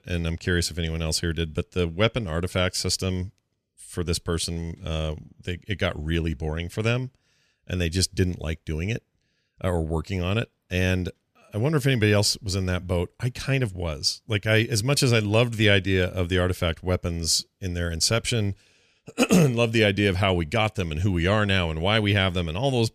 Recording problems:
none

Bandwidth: 14.5 kHz